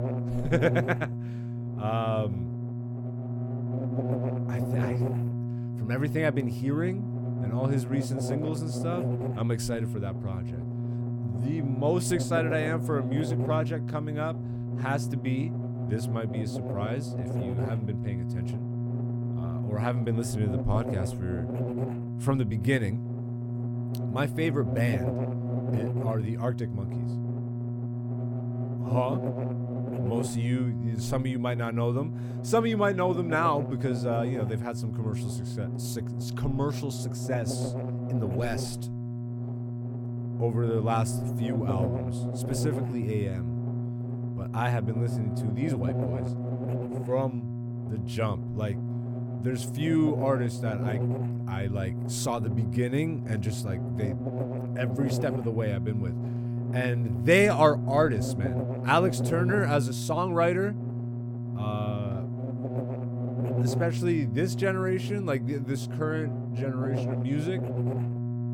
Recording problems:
electrical hum; loud; throughout; 60 Hz, 8 dB below the speech

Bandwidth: 17 kHz